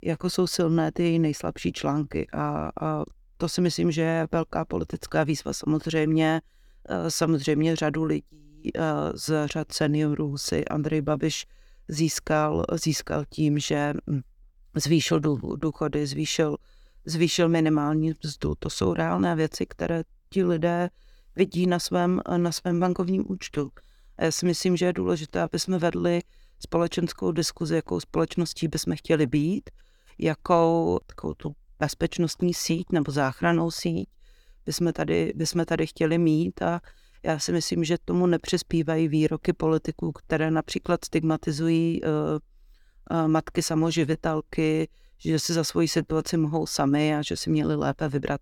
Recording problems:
none

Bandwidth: 18 kHz